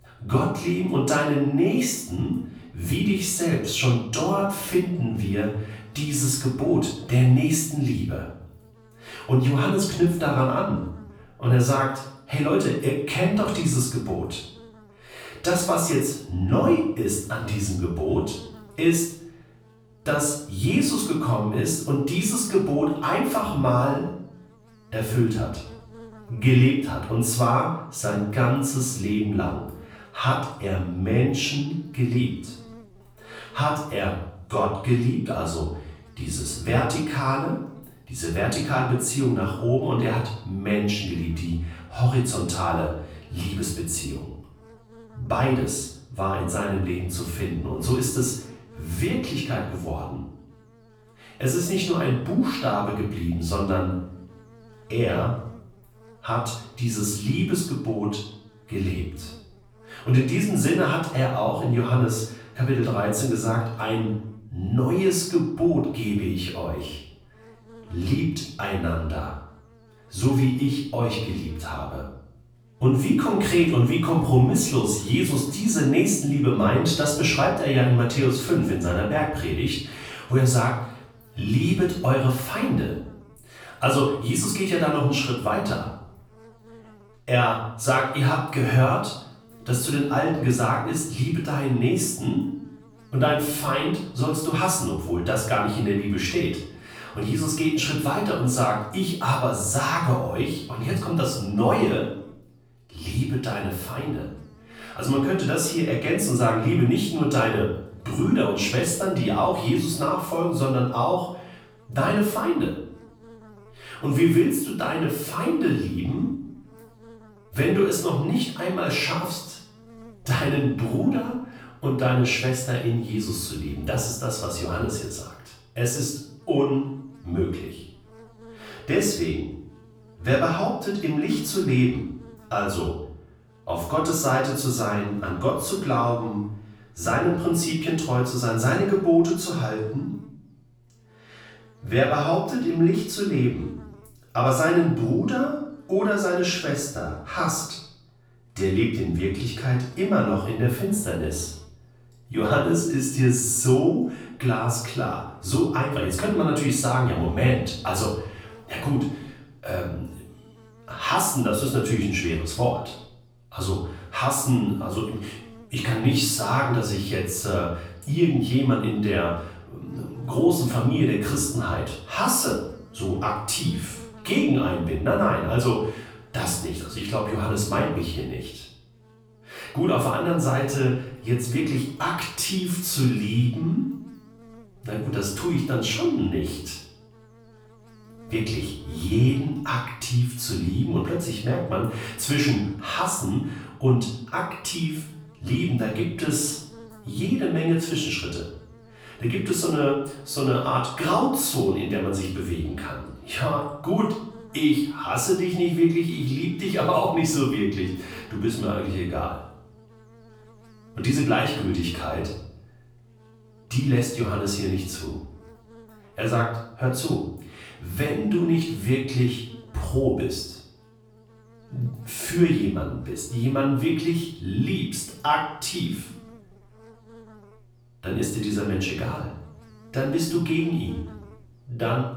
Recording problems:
off-mic speech; far
room echo; noticeable; dies away in 0.6 s
electrical hum; faint; throughout; 60 Hz, 25 dB below the speech

